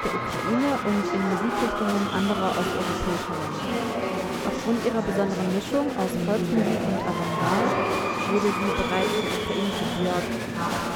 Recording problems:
murmuring crowd; very loud; throughout; 1 dB above the speech

